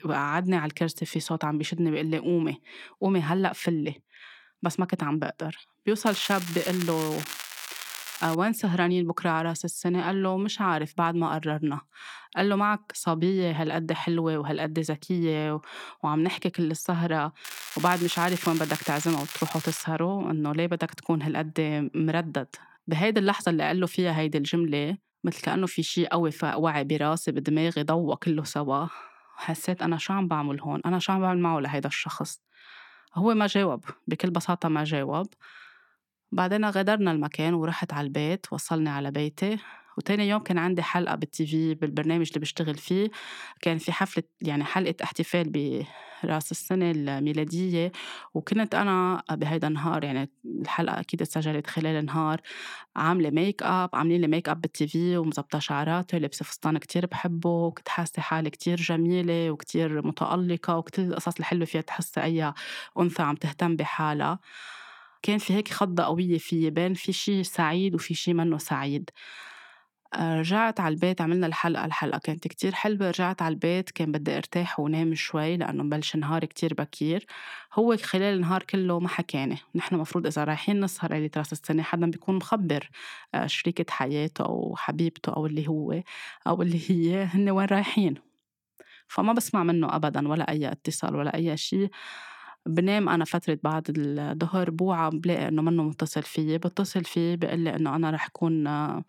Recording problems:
crackling; loud; from 6 to 8.5 s and from 17 to 20 s; 9 dB below the speech

